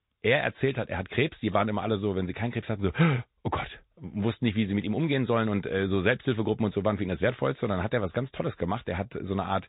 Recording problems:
high frequencies cut off; severe; nothing above 4 kHz
garbled, watery; slightly

